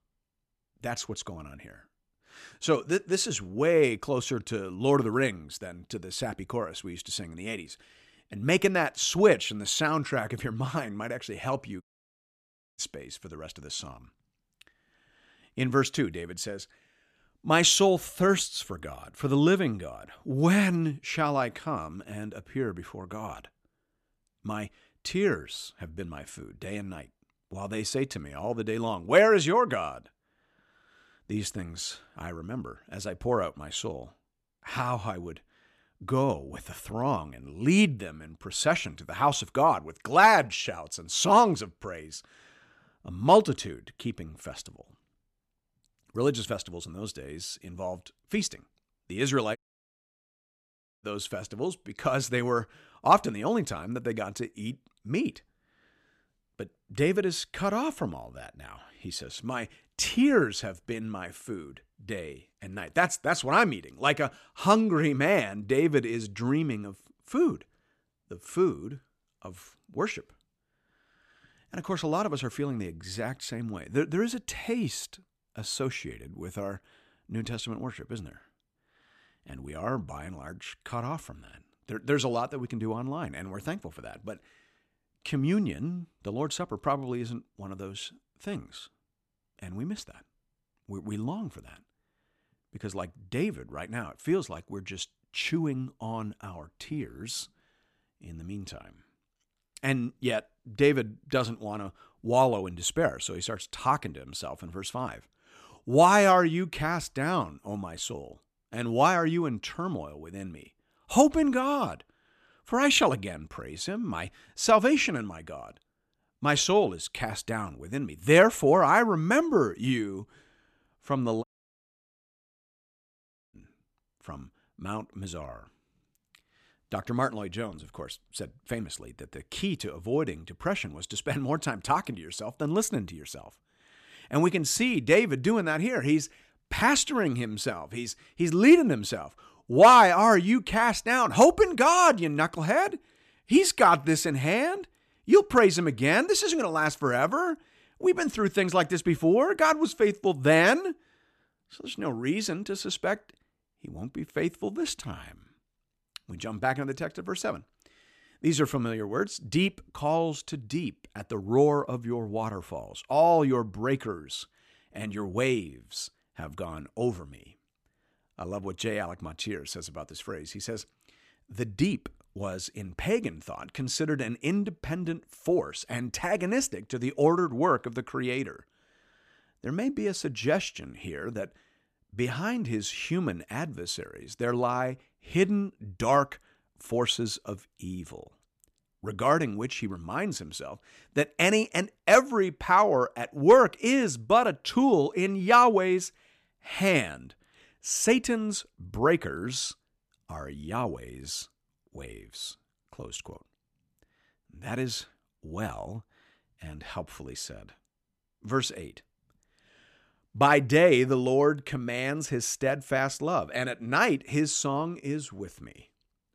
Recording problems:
audio cutting out; at 12 s for 1 s, at 50 s for 1.5 s and at 2:01 for 2 s

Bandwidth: 14 kHz